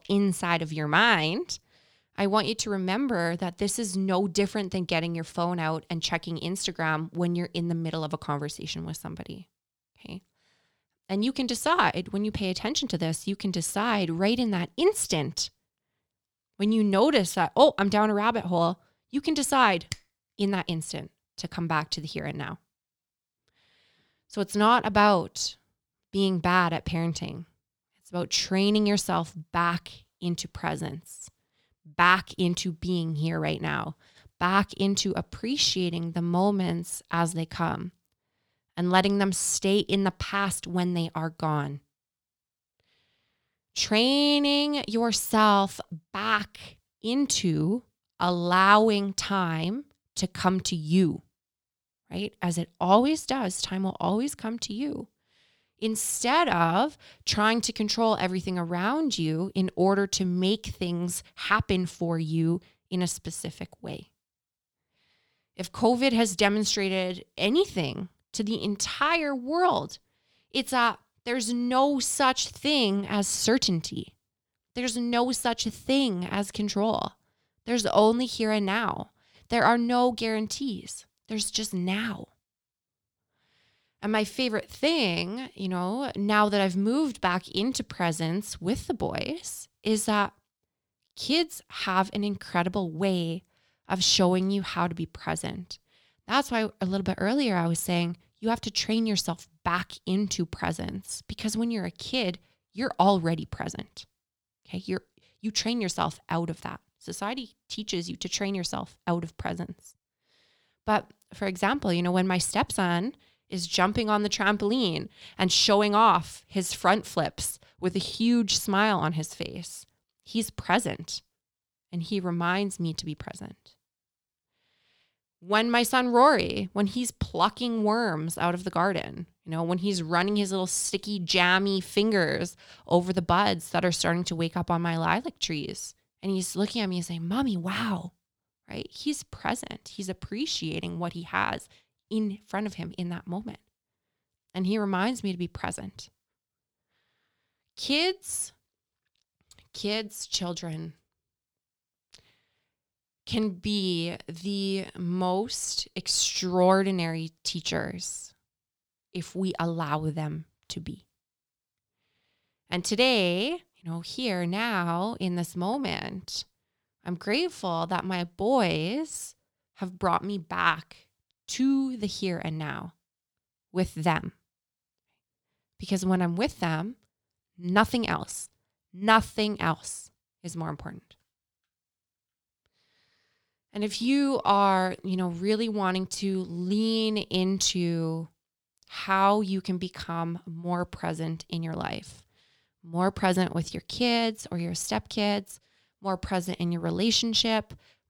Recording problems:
none

